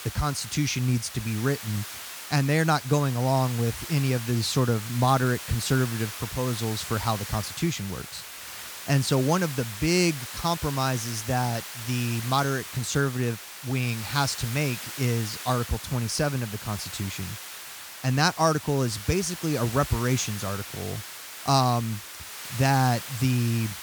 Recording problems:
hiss; loud; throughout; 10 dB below the speech

